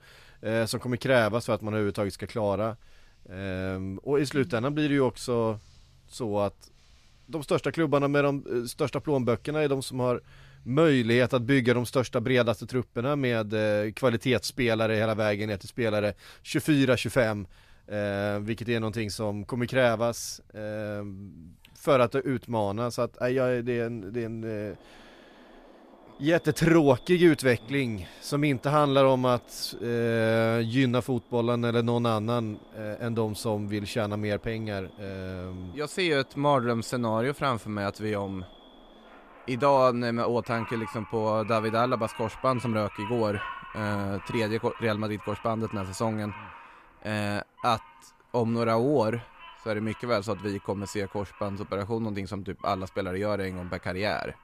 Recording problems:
animal sounds; faint; throughout; 20 dB below the speech

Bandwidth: 14.5 kHz